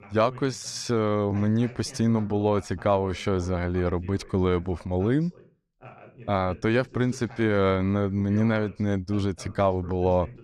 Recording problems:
voice in the background; faint; throughout; 20 dB below the speech

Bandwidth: 14.5 kHz